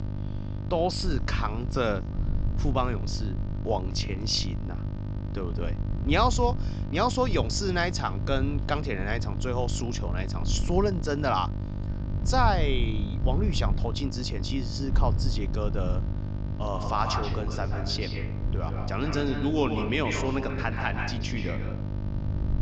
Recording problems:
echo of what is said; strong; from 16 s on; 130 ms later, 6 dB below the speech
high frequencies cut off; noticeable; nothing above 8 kHz
electrical hum; noticeable; throughout; 50 Hz, 15 dB below the speech
wind noise on the microphone; occasional gusts; 20 dB below the speech

